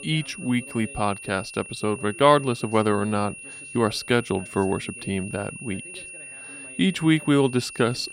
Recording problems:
high-pitched whine; noticeable; throughout; 2.5 kHz, 15 dB below the speech
voice in the background; faint; throughout; 25 dB below the speech

